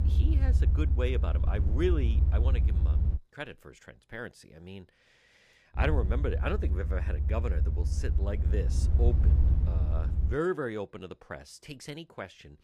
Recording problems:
low rumble; loud; until 3 s and from 6 to 10 s; 8 dB below the speech

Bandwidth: 15 kHz